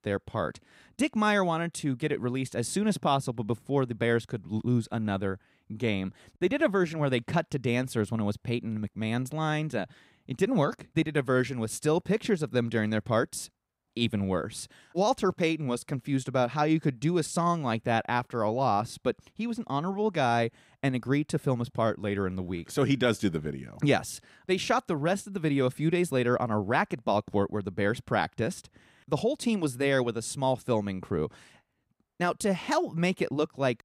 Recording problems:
none

